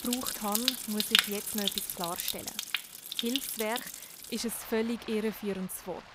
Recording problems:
rain or running water; very loud; throughout; 4 dB above the speech

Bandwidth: 15.5 kHz